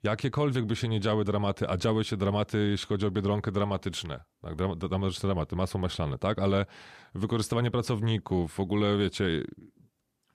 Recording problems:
none

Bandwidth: 14.5 kHz